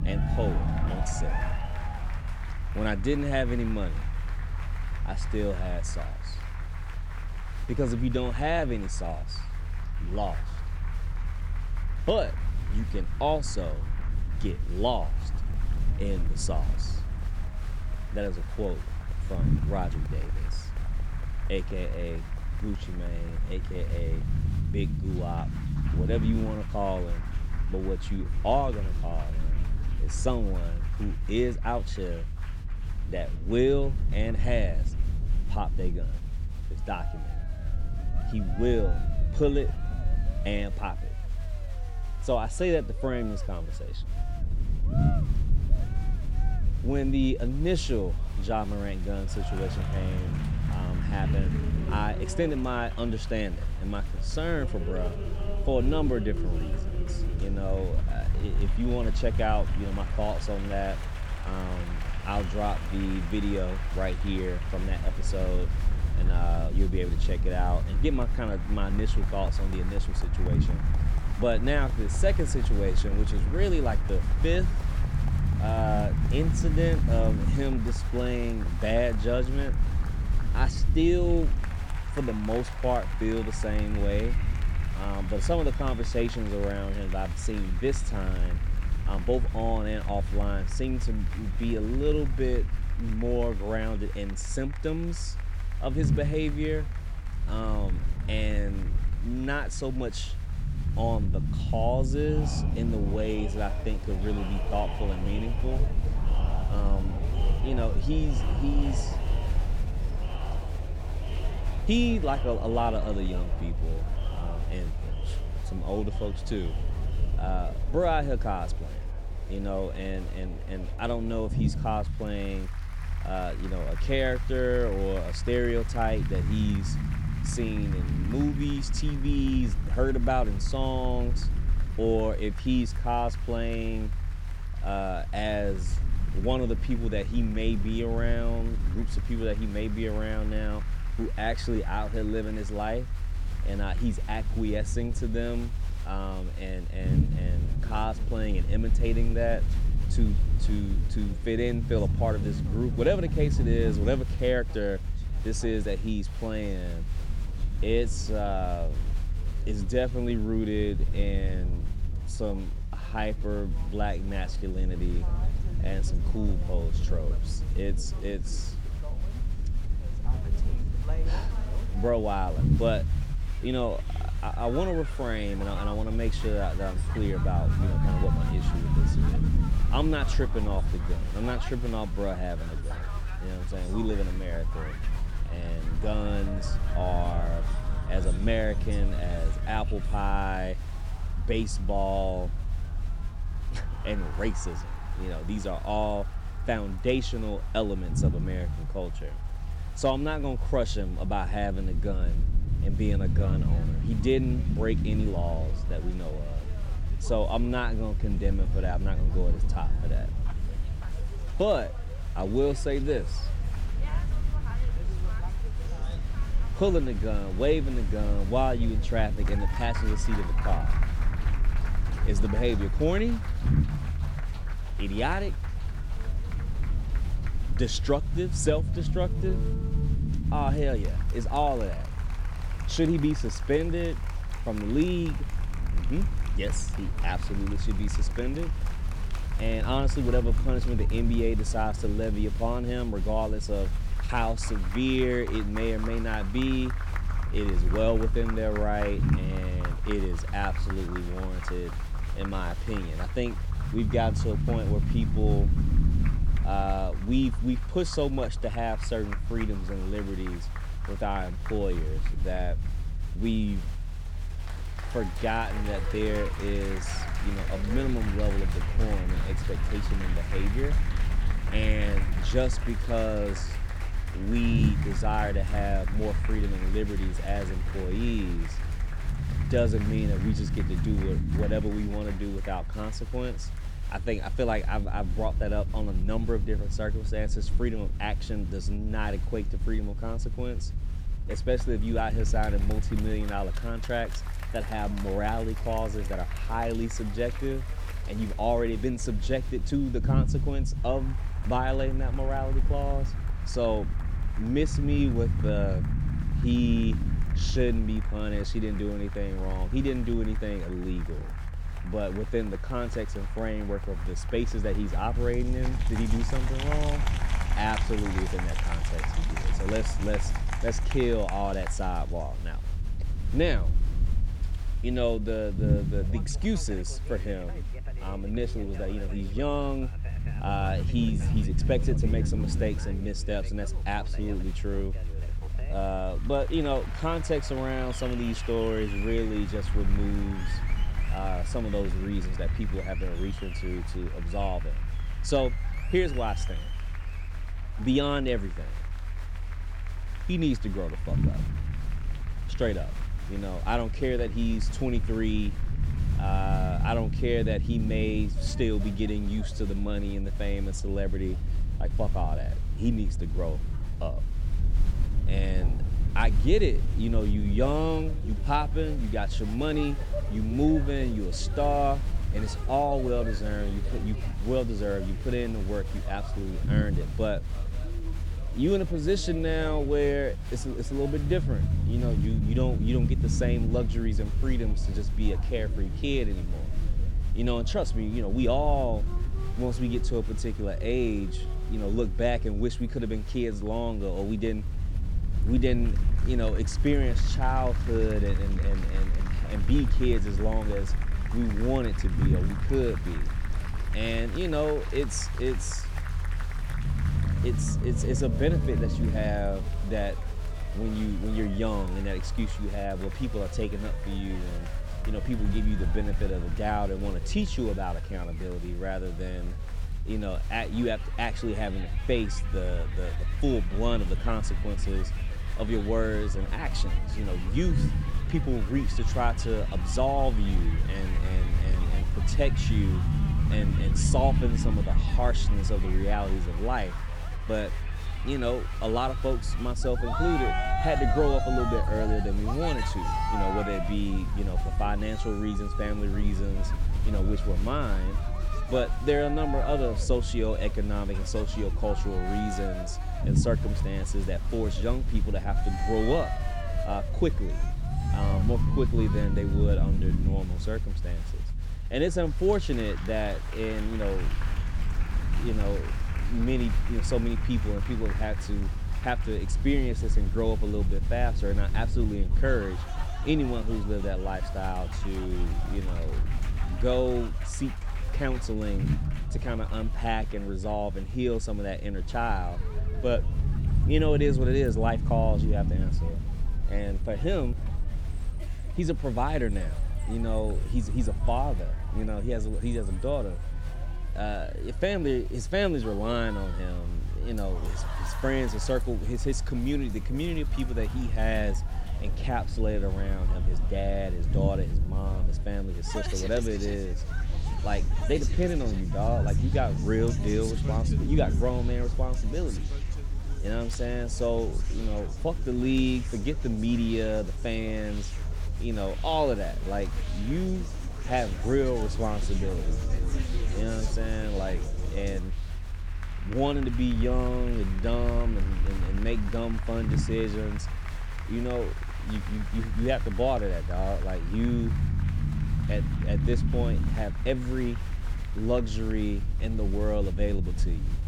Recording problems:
crowd noise; noticeable; throughout; 15 dB below the speech
low rumble; noticeable; throughout; 15 dB below the speech

